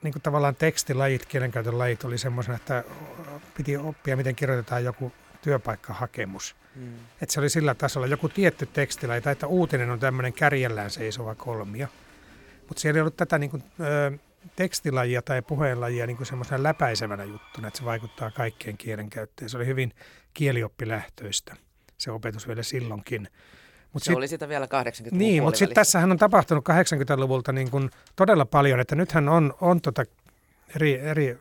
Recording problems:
crowd noise; faint; until 19 s; 25 dB below the speech

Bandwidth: 17.5 kHz